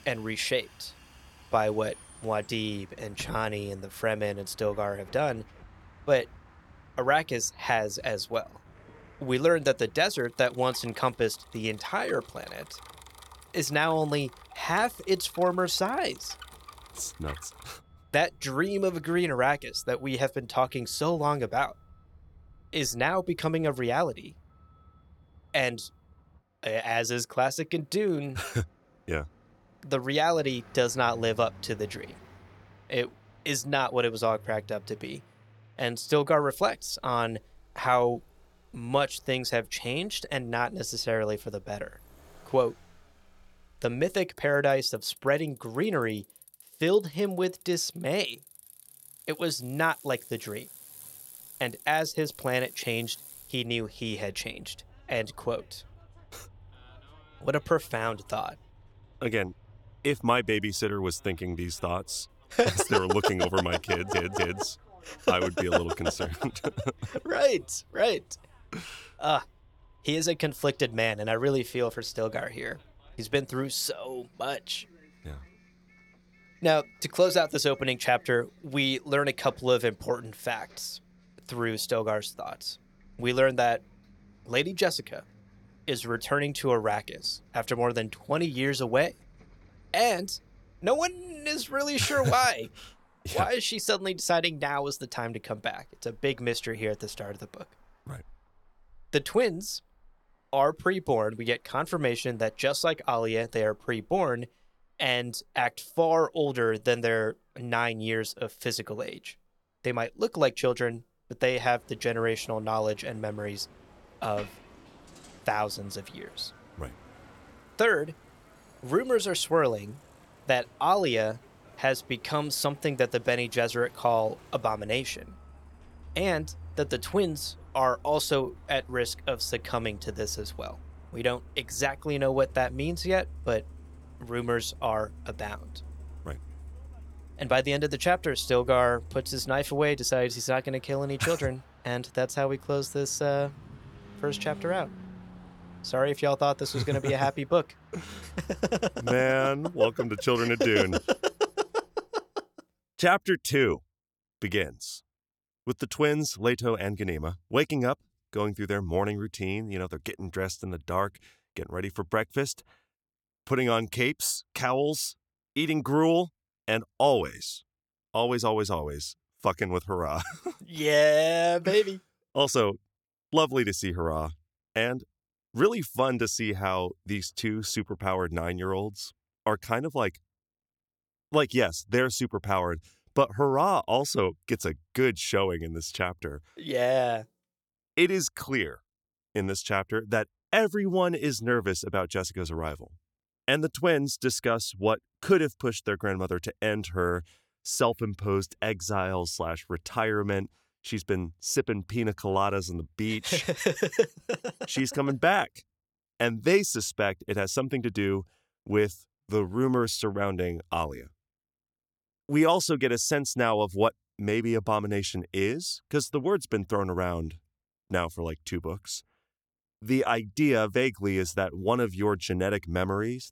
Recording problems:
traffic noise; faint; until 2:32; 25 dB below the speech
audio stuttering; at 1:04

